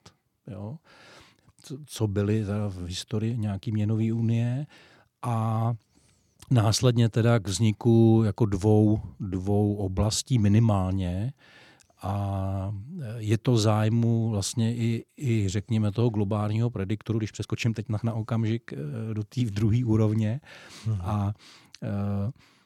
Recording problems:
uneven, jittery; strongly; from 5 to 18 s

